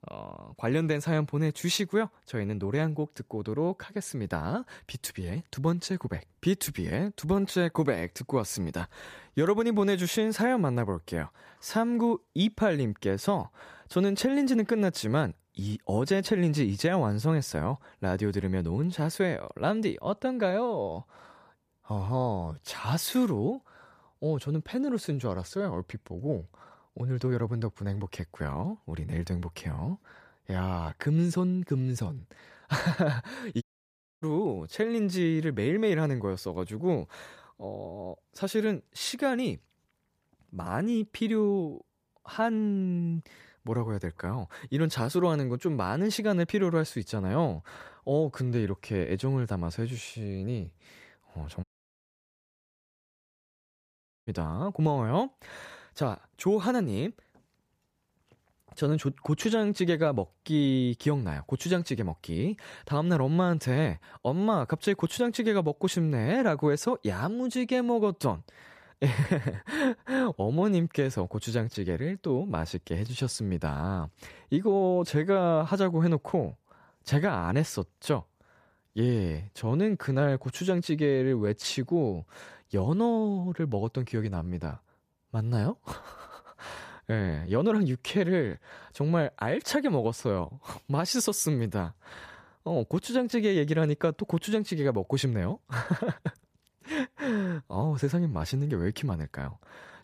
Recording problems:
audio cutting out; at 34 s for 0.5 s and at 52 s for 2.5 s

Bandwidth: 14.5 kHz